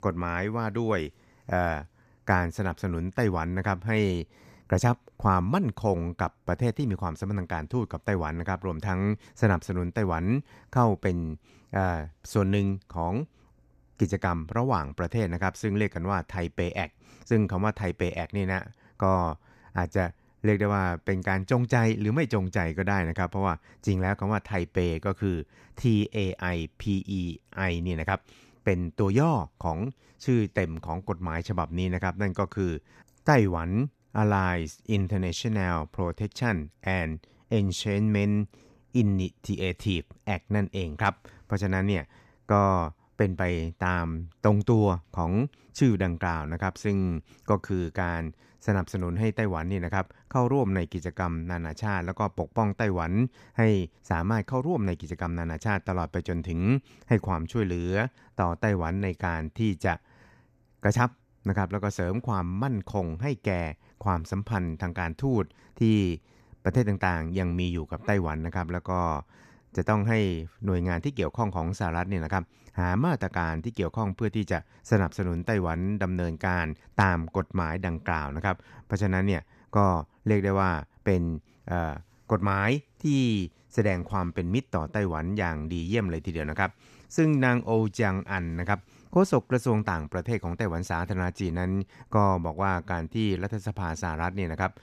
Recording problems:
none

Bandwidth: 14.5 kHz